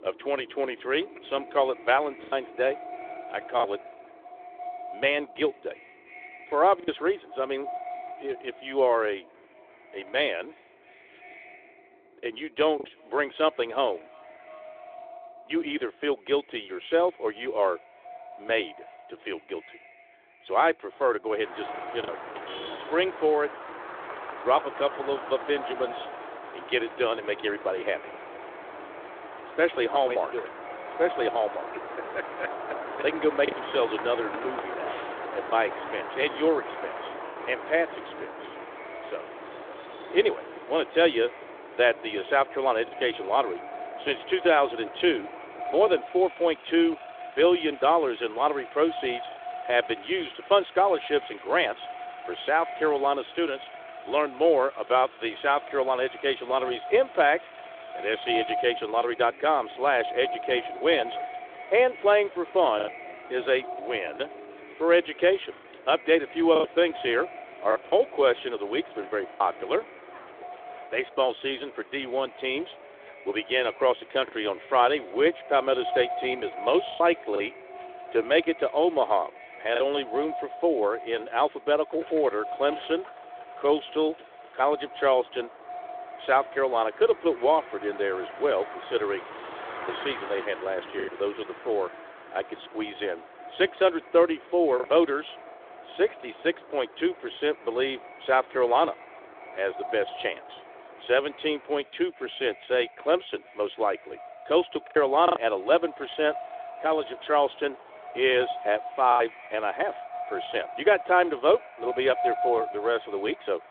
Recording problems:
echo of what is said; noticeable; throughout; 340 ms later, 15 dB below the speech
phone-call audio; nothing above 3.5 kHz
traffic noise; noticeable; throughout; 15 dB below the speech
choppy; occasionally; 2% of the speech affected

